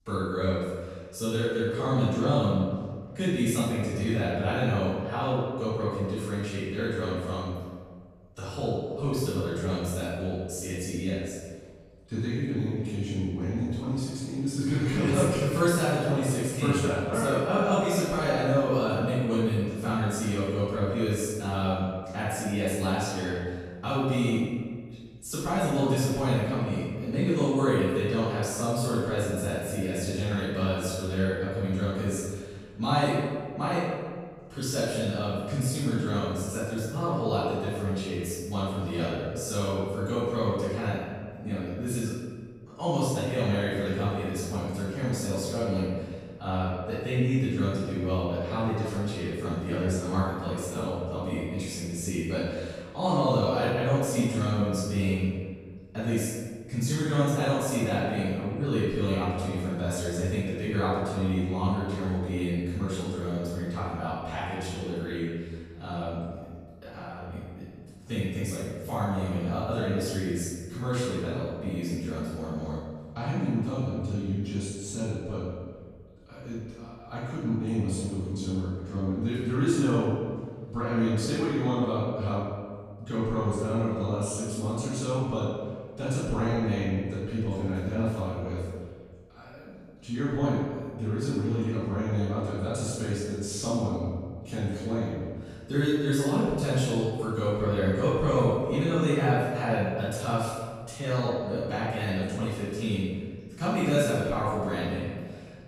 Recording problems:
room echo; strong; dies away in 1.5 s
off-mic speech; far

